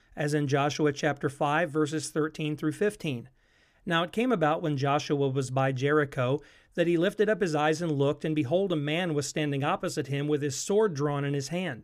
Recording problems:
none

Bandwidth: 14.5 kHz